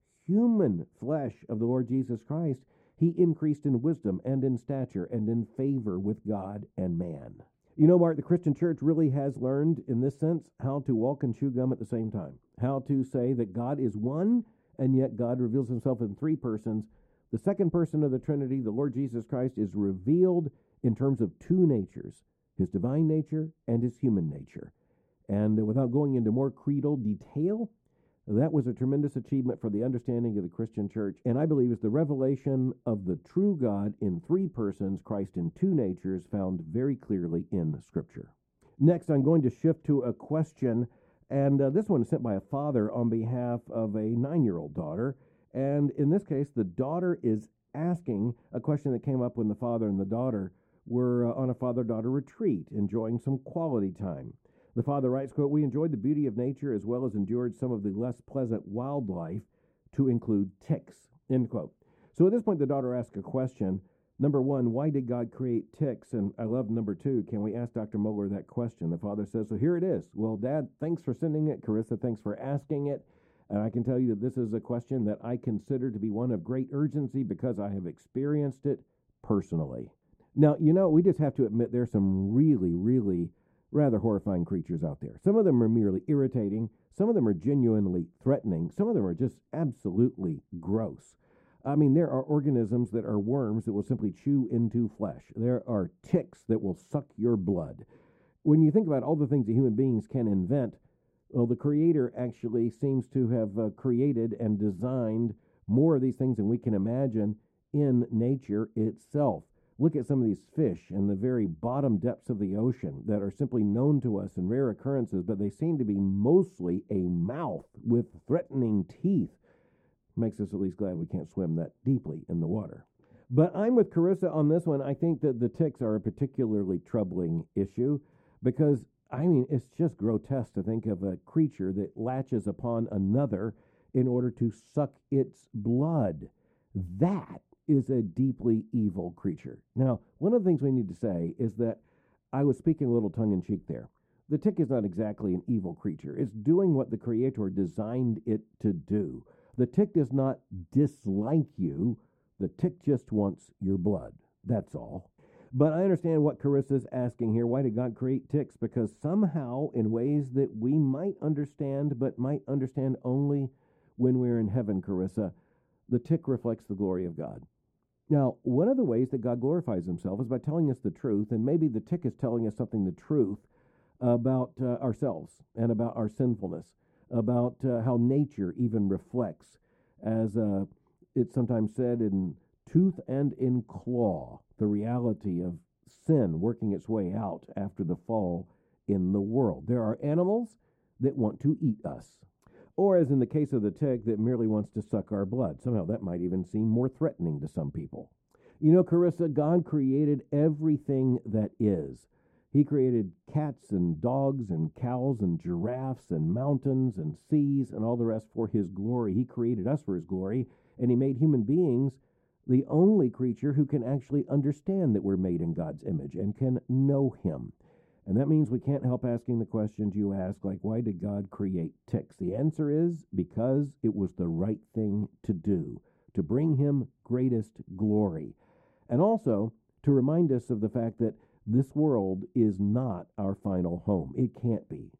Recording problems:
muffled; very; fading above 1 kHz

